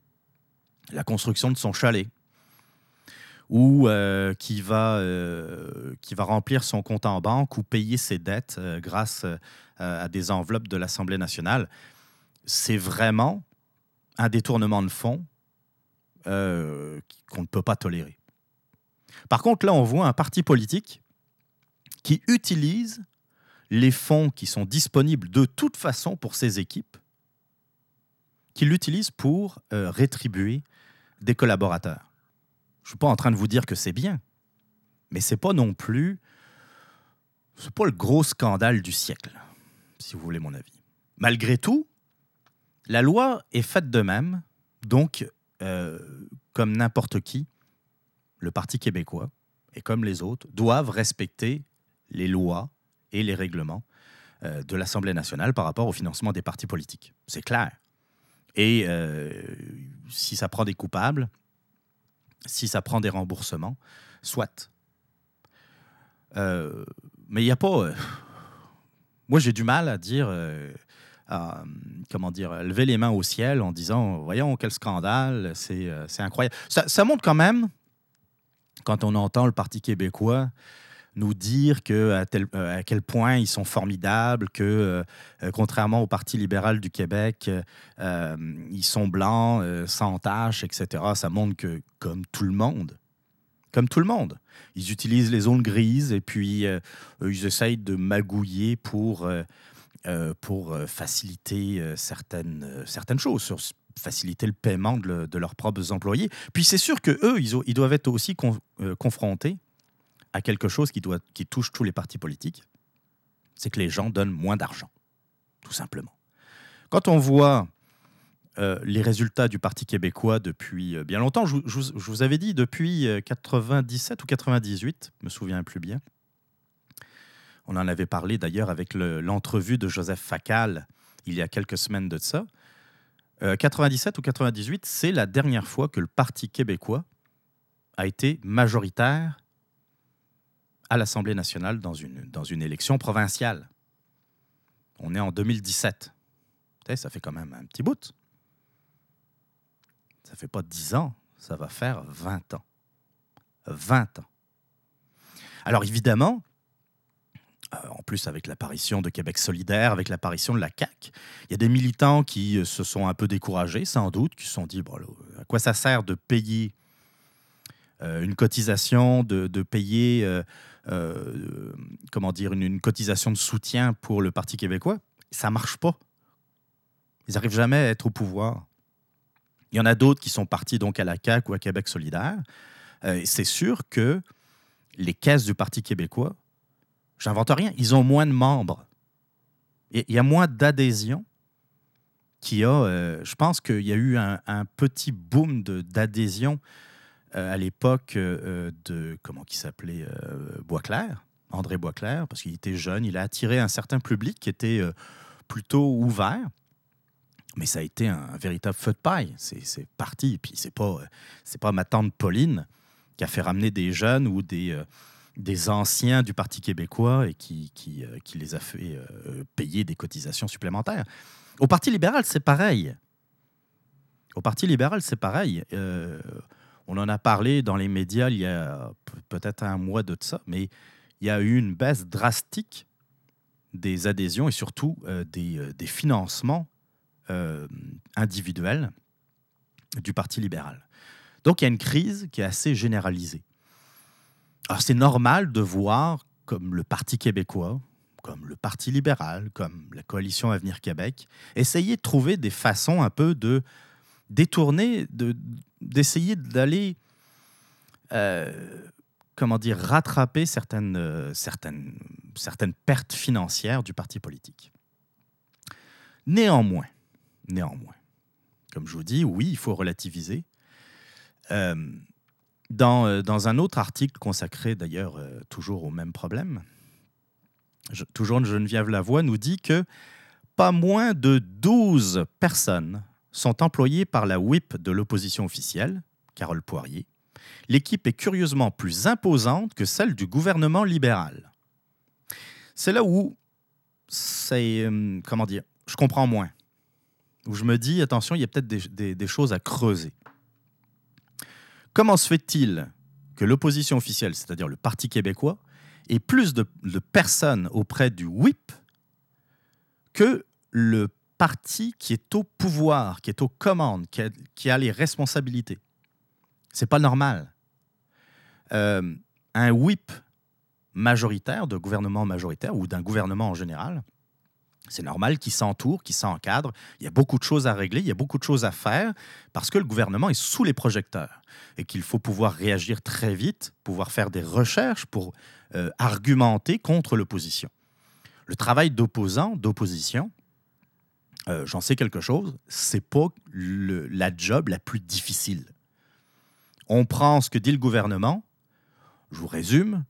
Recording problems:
none

